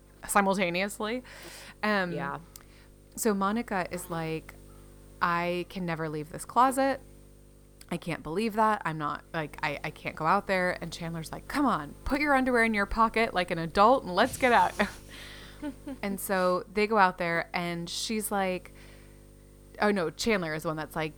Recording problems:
electrical hum; faint; throughout; 50 Hz, 30 dB below the speech

